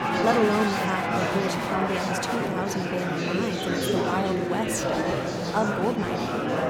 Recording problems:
murmuring crowd; very loud; throughout; 2 dB above the speech

